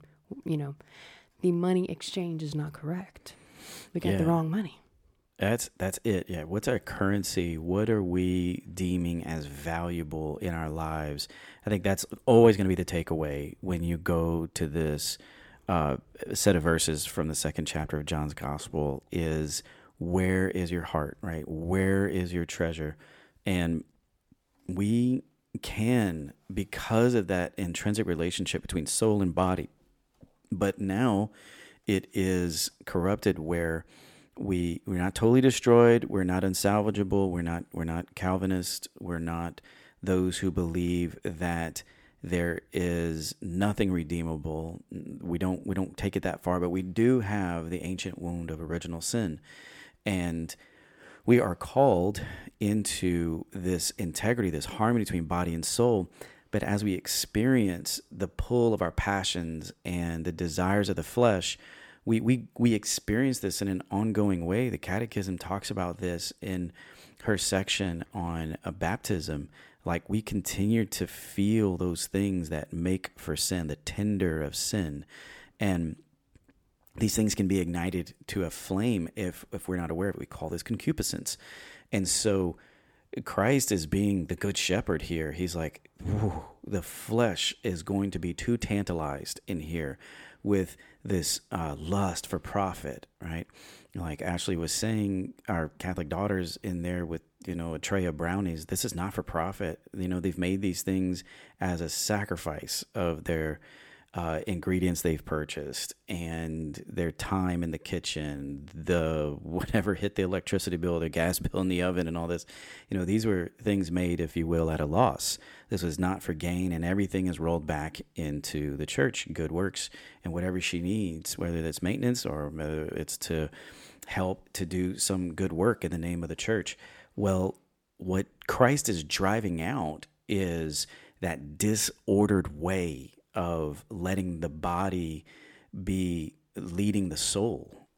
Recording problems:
none

